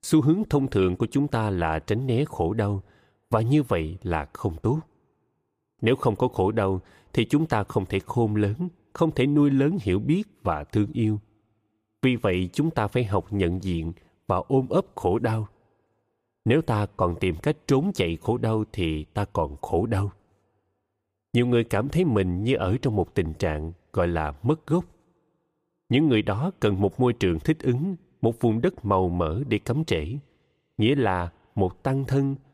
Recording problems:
none

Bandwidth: 15 kHz